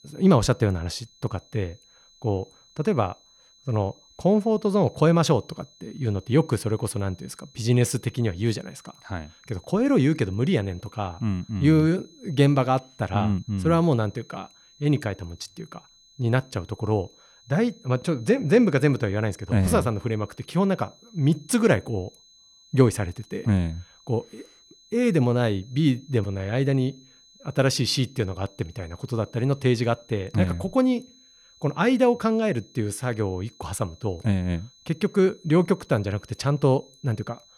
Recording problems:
high-pitched whine; faint; throughout; 4 kHz, 30 dB below the speech

